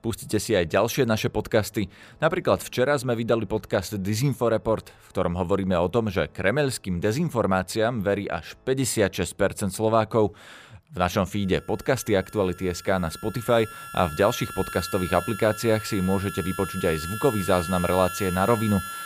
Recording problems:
background music; noticeable; throughout; 10 dB below the speech

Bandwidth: 15 kHz